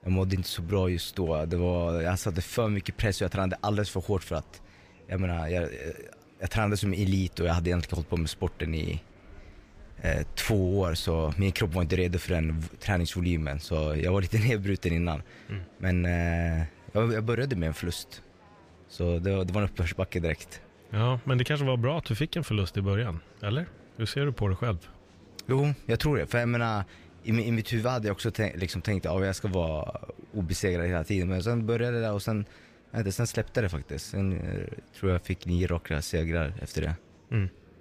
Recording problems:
murmuring crowd; faint; throughout; 25 dB below the speech

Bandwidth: 15 kHz